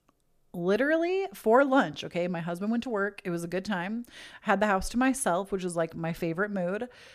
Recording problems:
none

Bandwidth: 14.5 kHz